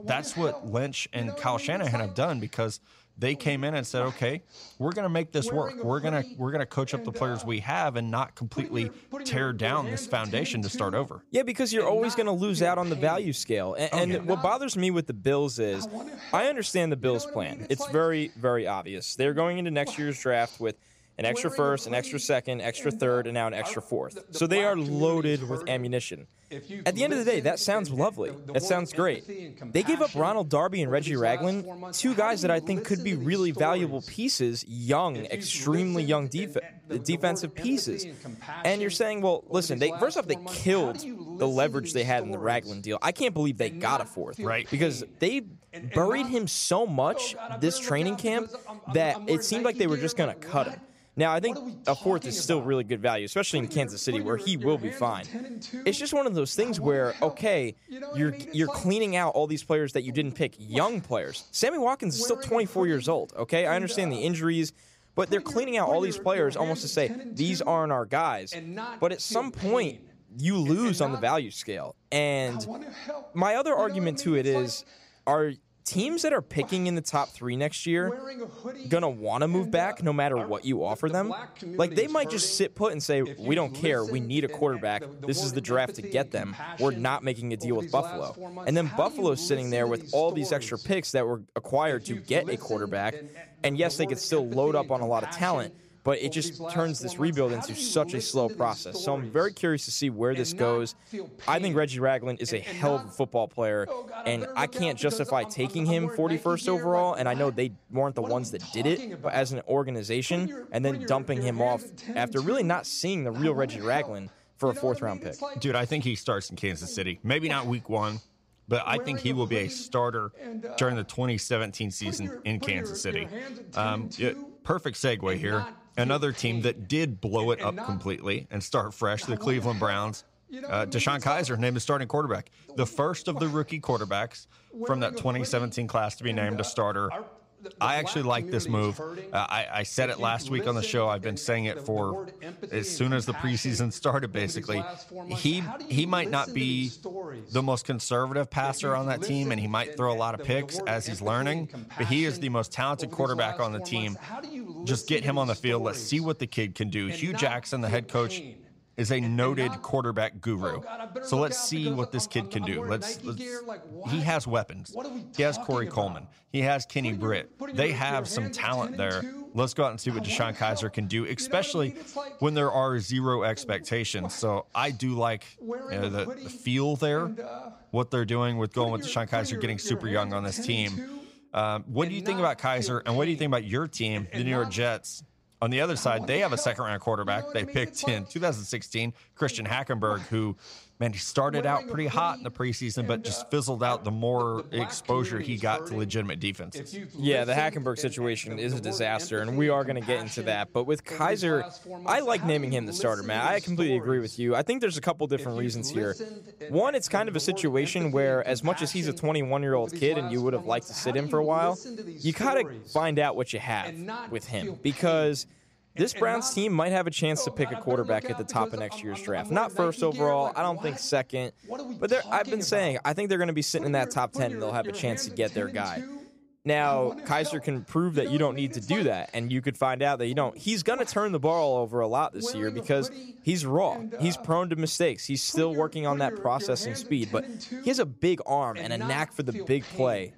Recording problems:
voice in the background; noticeable; throughout; 10 dB below the speech

